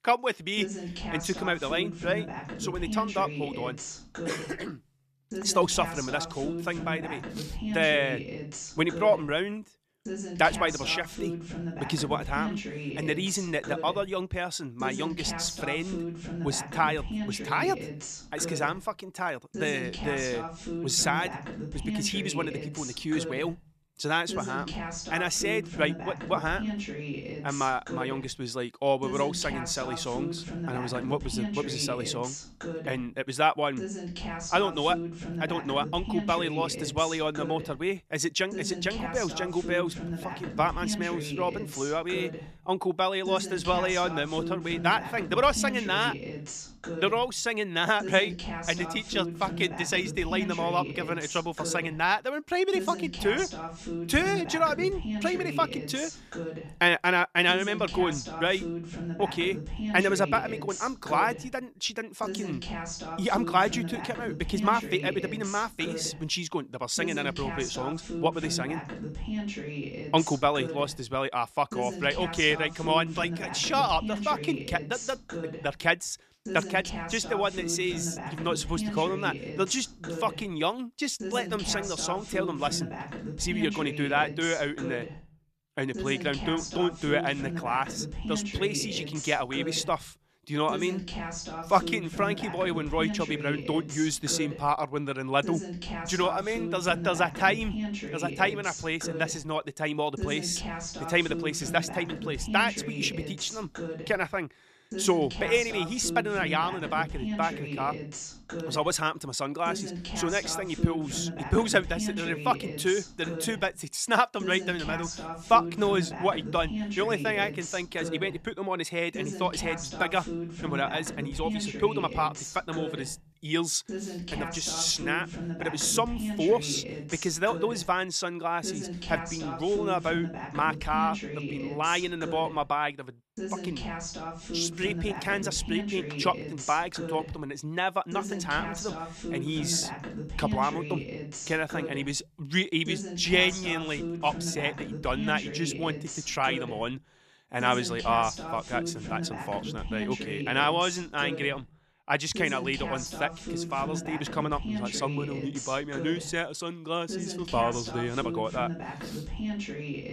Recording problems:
voice in the background; loud; throughout; 7 dB below the speech

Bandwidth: 14 kHz